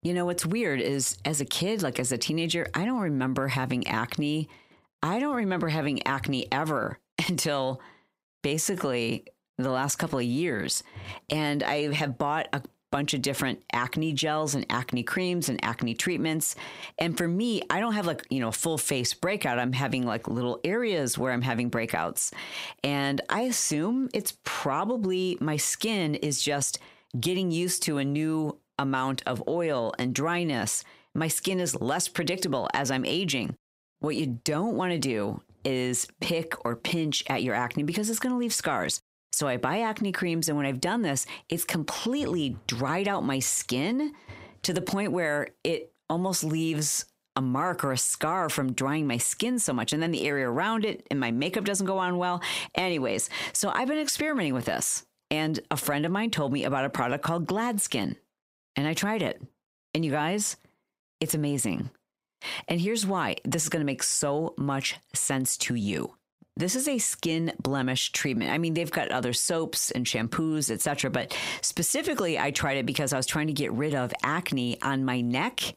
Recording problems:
squashed, flat; heavily

